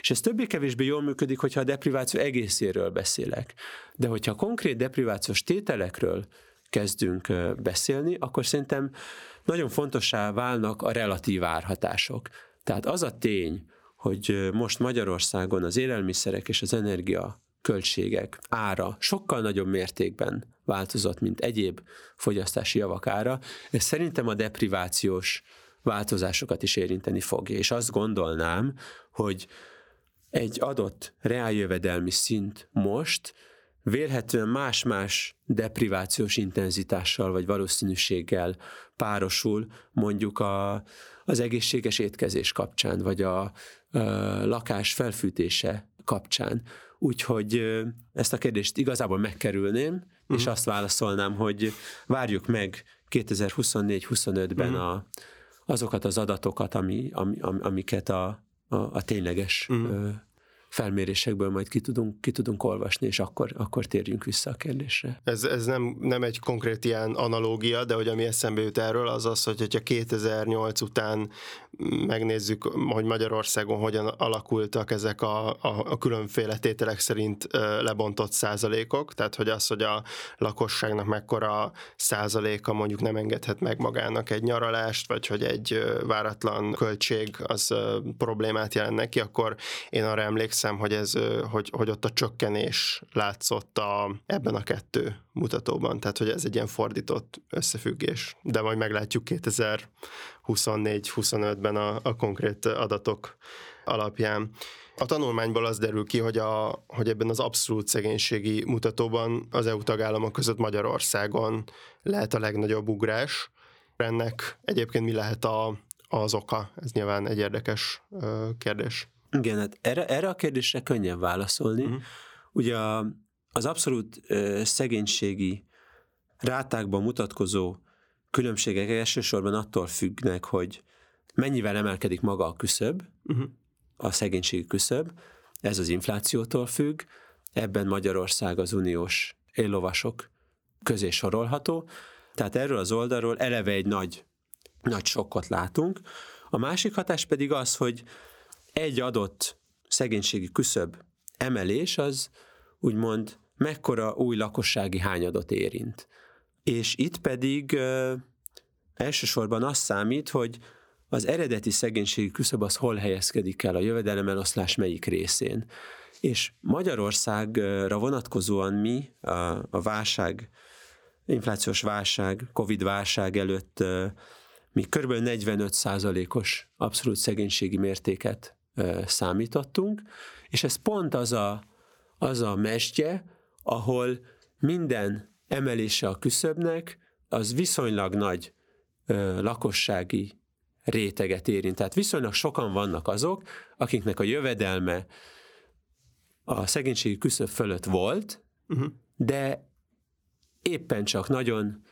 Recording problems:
squashed, flat; somewhat

